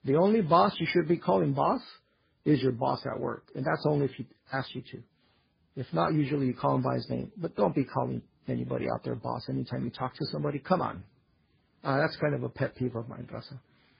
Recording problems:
garbled, watery; badly; nothing above 5 kHz

